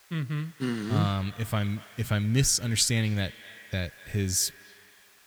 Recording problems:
echo of what is said; faint; throughout; 240 ms later, 20 dB below the speech
hiss; faint; throughout; 25 dB below the speech

